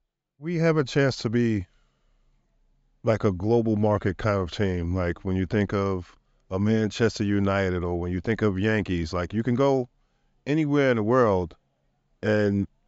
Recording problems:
high frequencies cut off; noticeable; nothing above 8 kHz

